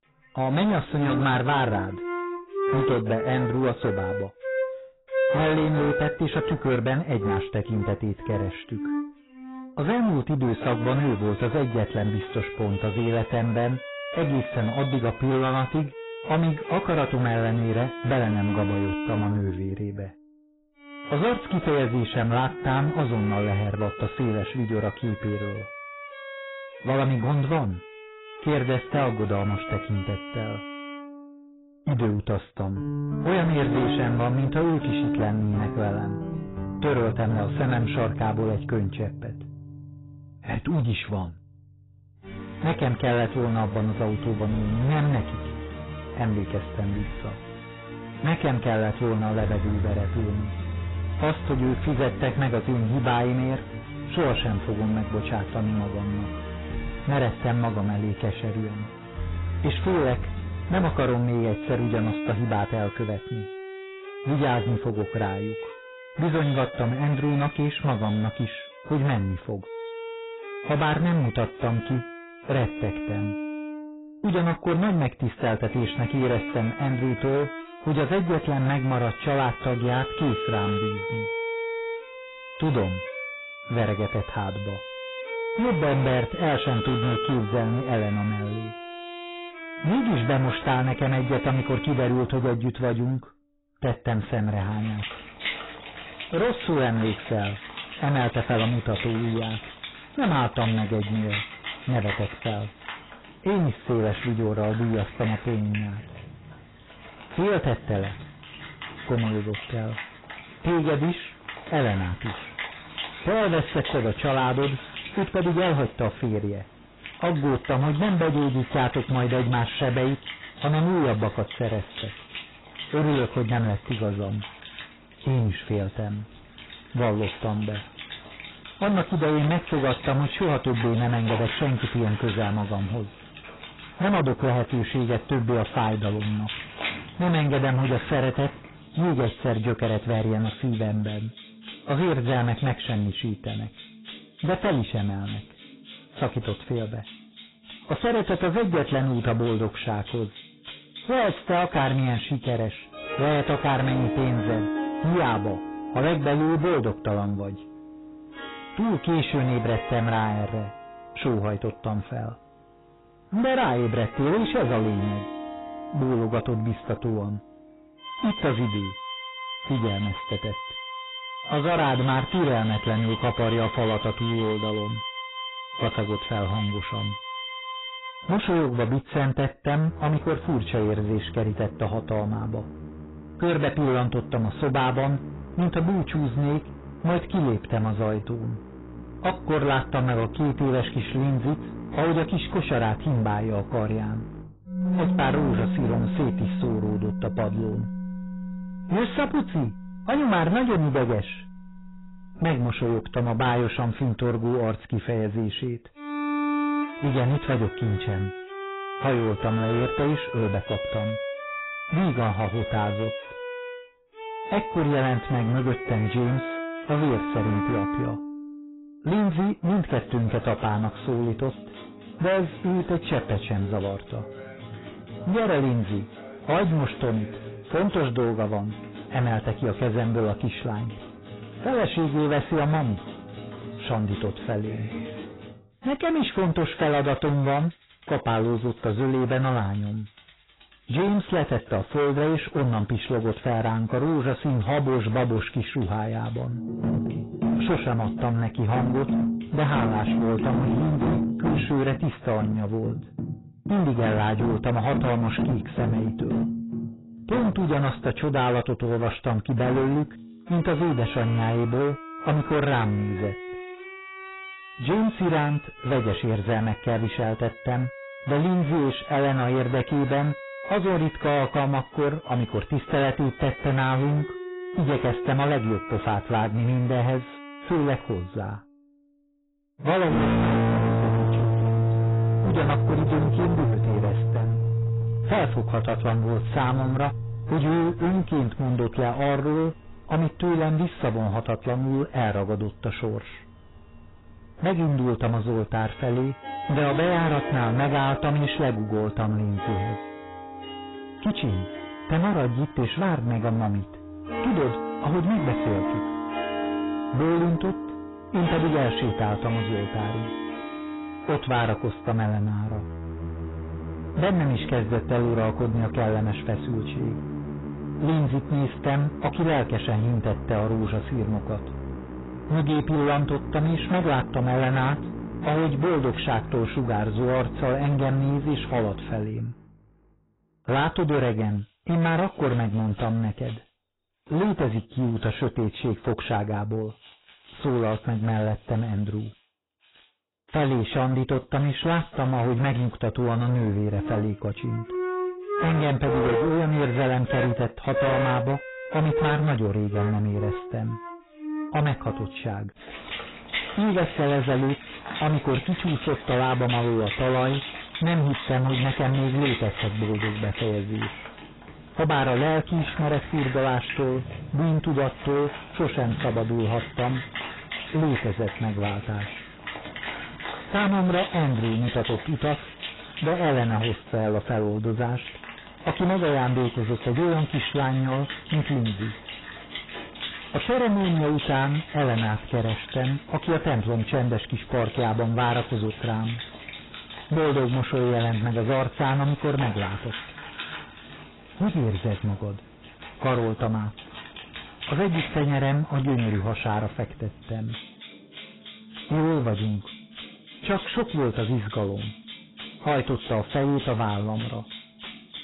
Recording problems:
distortion; heavy; 17% of the sound clipped
garbled, watery; badly; nothing above 4 kHz
background music; loud; throughout; 8 dB below the speech

